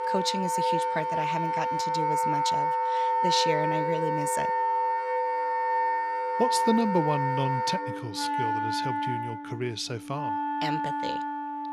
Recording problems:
background music; very loud; throughout; 4 dB above the speech

